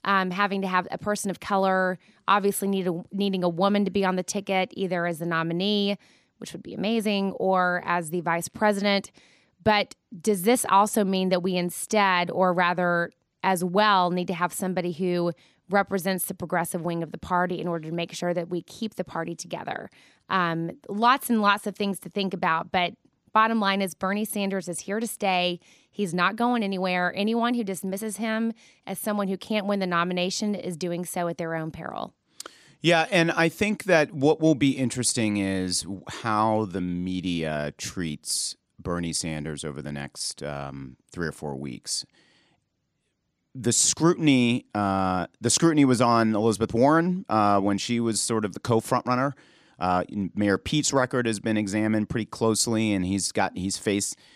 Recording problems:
none

